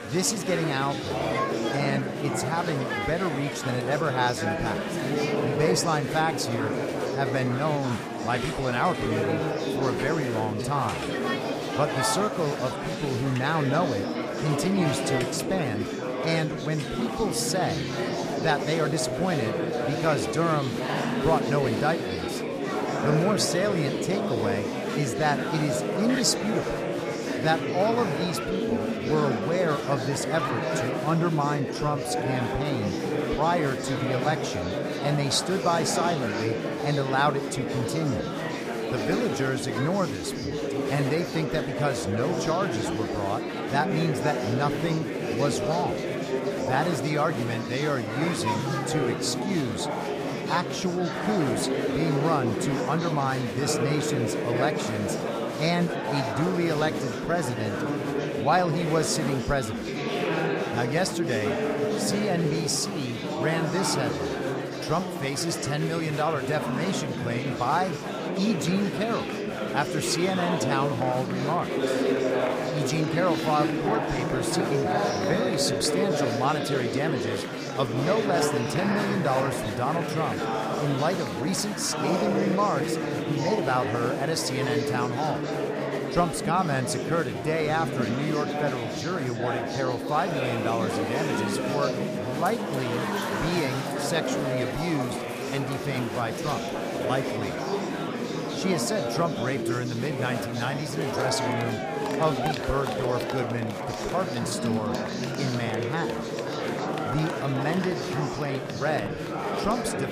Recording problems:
murmuring crowd; loud; throughout; as loud as the speech

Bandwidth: 15 kHz